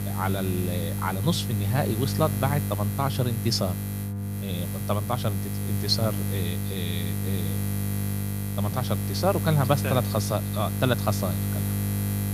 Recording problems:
electrical hum; loud; throughout; 50 Hz, 8 dB below the speech

